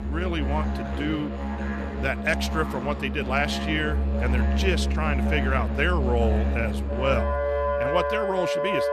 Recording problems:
background music; very loud; throughout; 1 dB above the speech

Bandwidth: 14 kHz